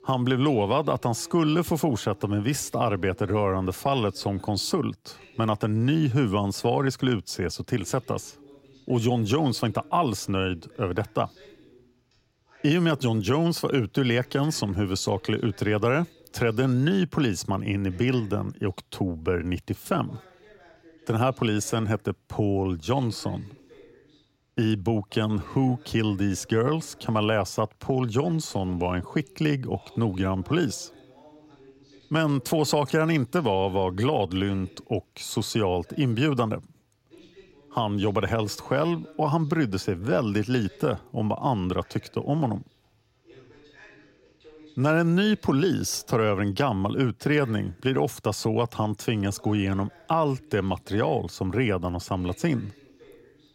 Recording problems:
voice in the background; faint; throughout; 25 dB below the speech

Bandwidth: 16 kHz